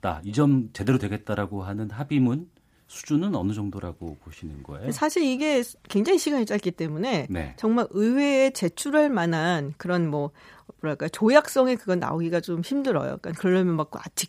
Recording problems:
none

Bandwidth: 15 kHz